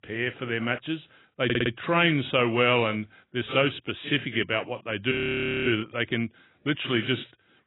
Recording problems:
garbled, watery; badly; nothing above 3.5 kHz
audio stuttering; at 1.5 s
audio freezing; at 5 s for 0.5 s

